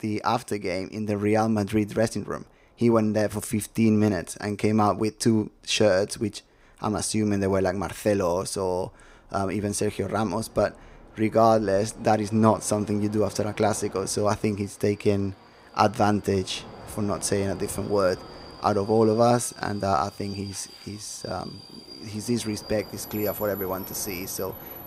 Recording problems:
train or aircraft noise; noticeable; throughout; 15 dB below the speech

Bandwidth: 15.5 kHz